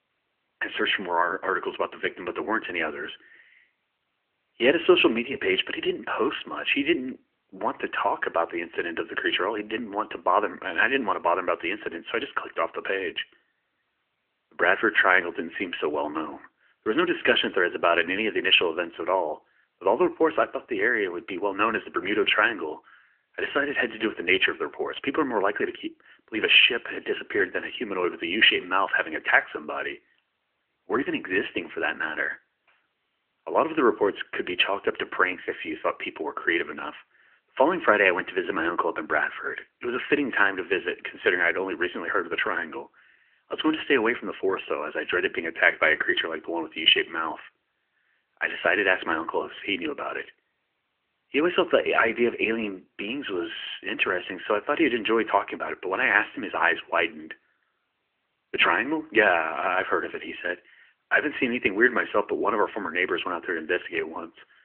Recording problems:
phone-call audio; nothing above 3 kHz

